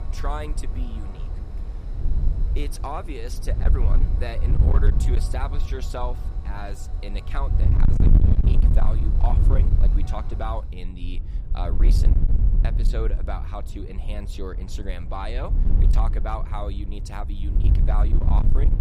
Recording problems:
distortion; heavy; 8% of the sound clipped
wind noise on the microphone; heavy; 4 dB below the speech
train or aircraft noise; noticeable; throughout; 15 dB below the speech

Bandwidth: 14.5 kHz